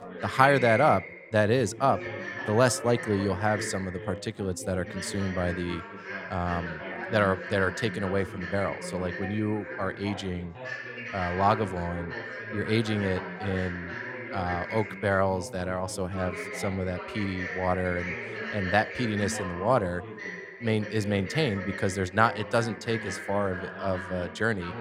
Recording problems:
background chatter; loud; throughout; 4 voices, 8 dB below the speech

